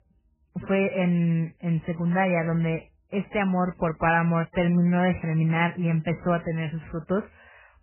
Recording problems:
garbled, watery; badly; nothing above 3 kHz

